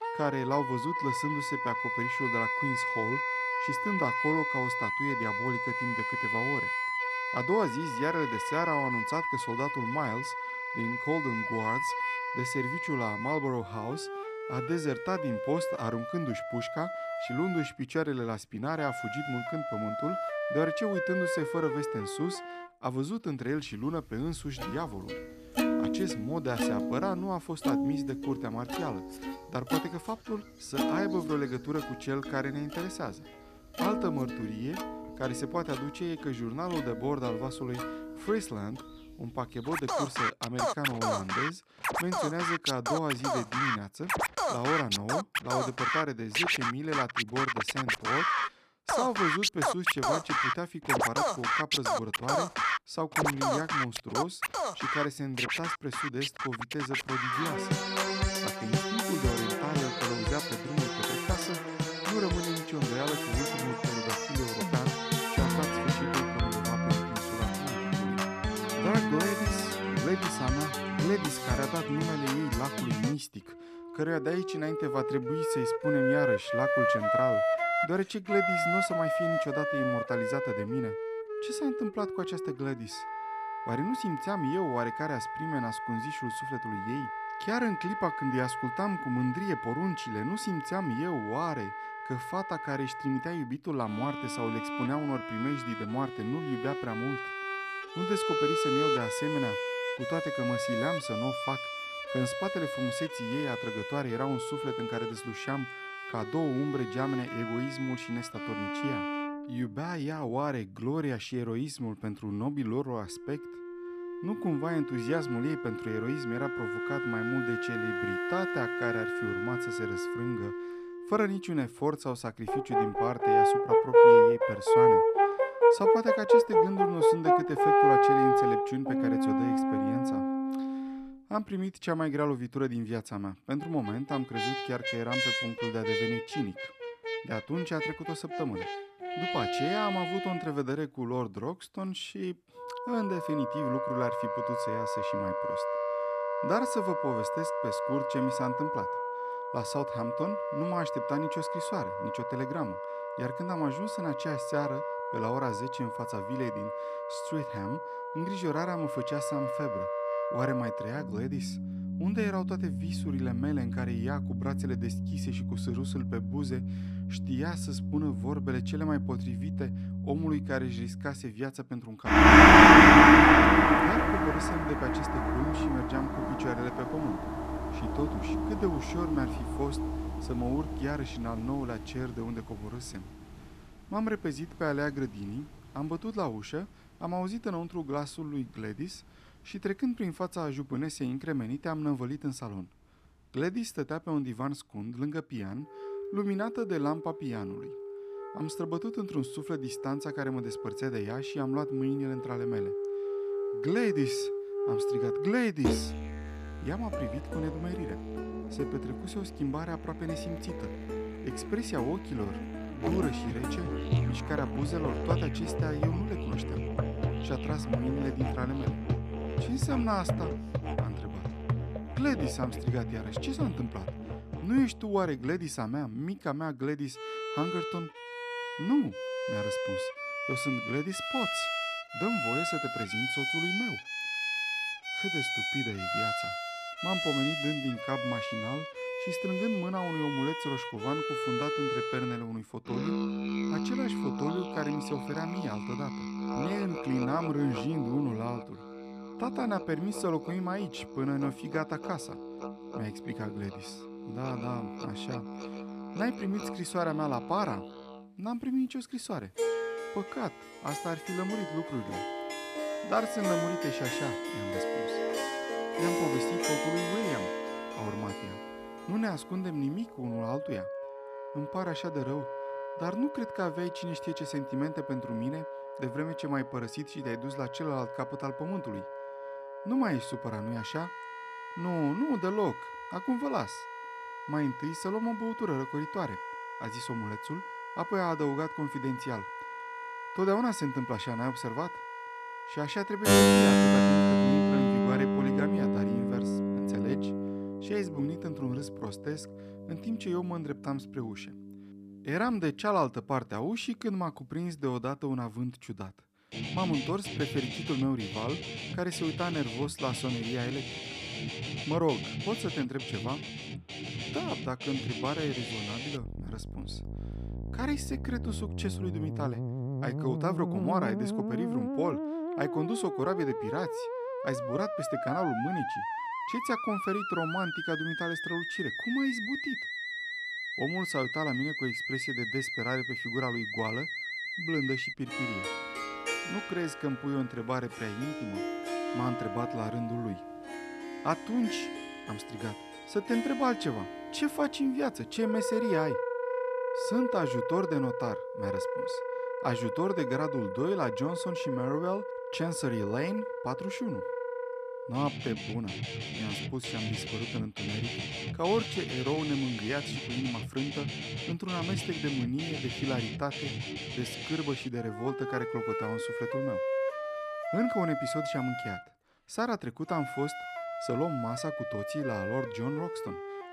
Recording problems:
background music; very loud; throughout; 3 dB above the speech

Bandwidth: 14.5 kHz